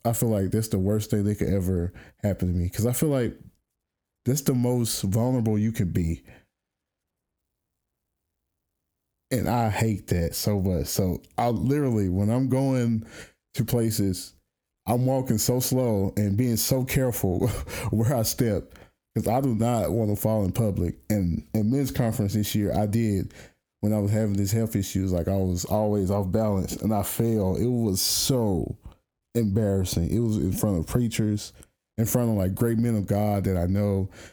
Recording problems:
squashed, flat; heavily

